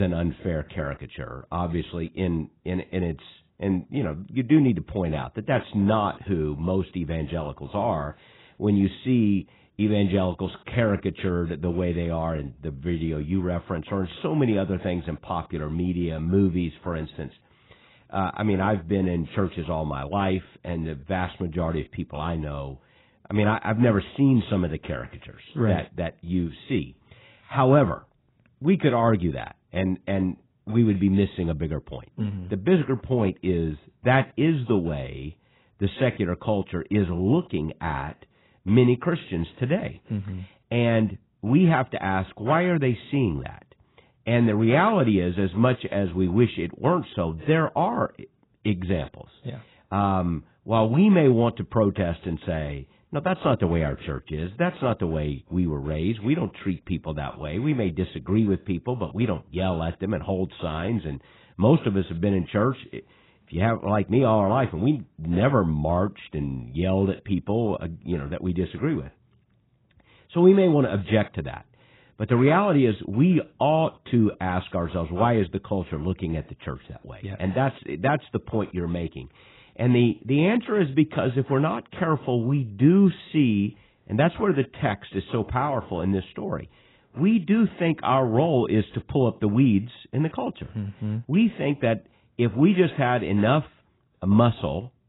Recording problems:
garbled, watery; badly; nothing above 4 kHz
abrupt cut into speech; at the start

